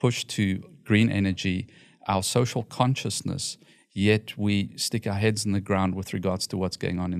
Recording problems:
abrupt cut into speech; at the end

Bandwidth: 14 kHz